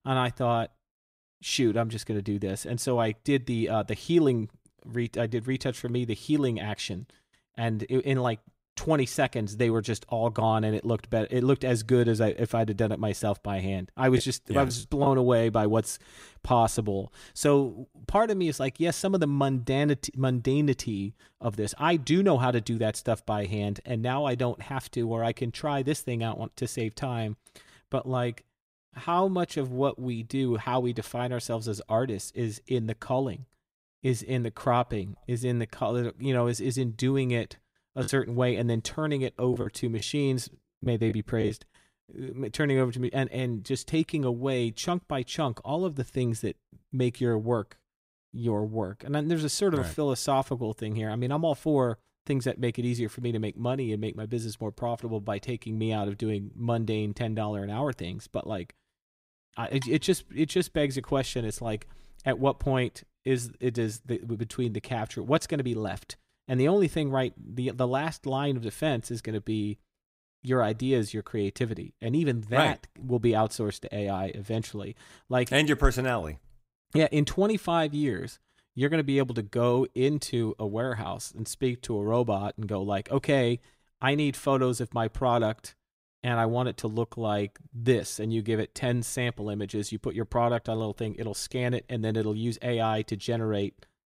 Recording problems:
choppy; very; at 14 s and from 38 to 42 s; 7% of the speech affected

